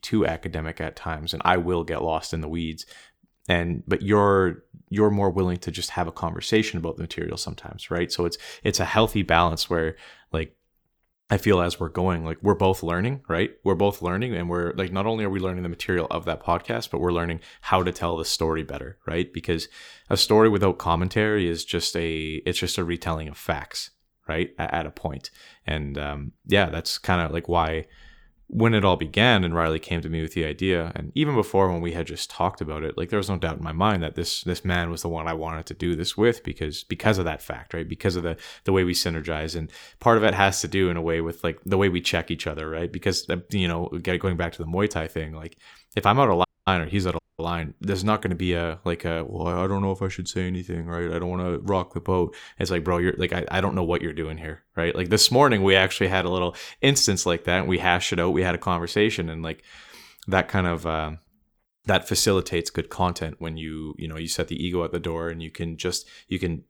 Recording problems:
audio cutting out; at 46 s and at 47 s

